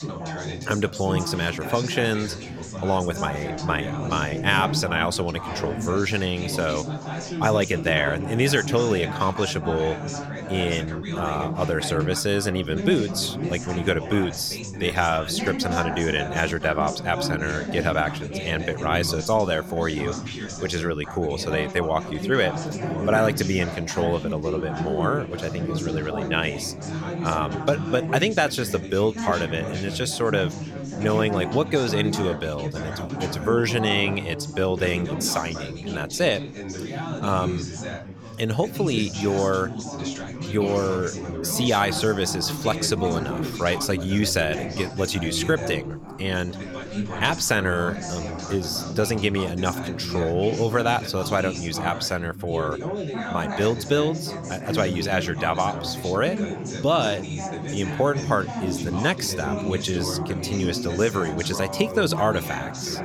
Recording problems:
background chatter; loud; throughout; 4 voices, 6 dB below the speech

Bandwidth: 17 kHz